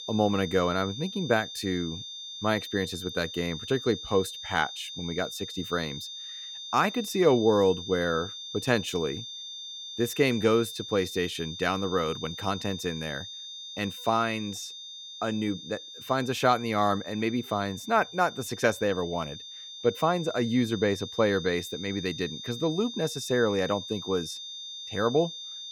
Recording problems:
high-pitched whine; loud; throughout; 3.5 kHz, 10 dB below the speech

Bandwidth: 17.5 kHz